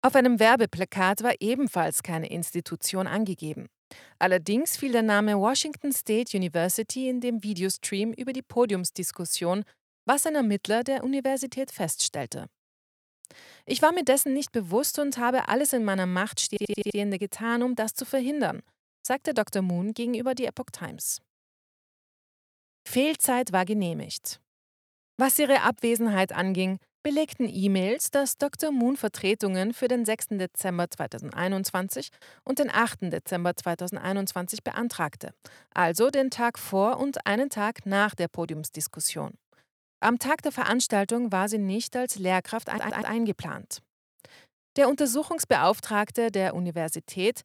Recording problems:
audio stuttering; at 16 s and at 43 s

